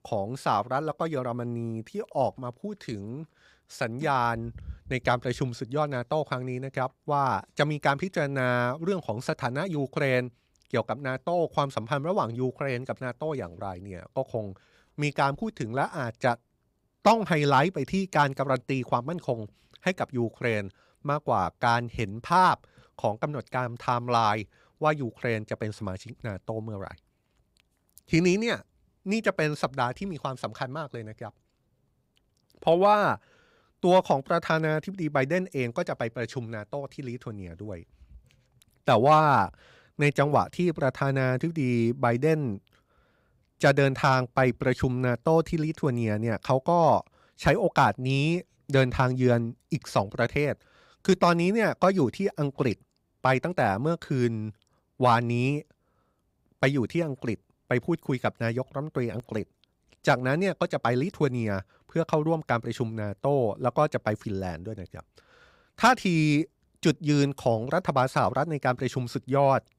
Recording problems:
none

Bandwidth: 15.5 kHz